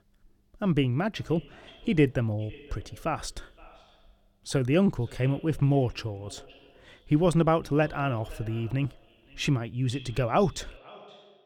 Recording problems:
echo of what is said; faint; throughout; 520 ms later, 25 dB below the speech

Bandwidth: 17.5 kHz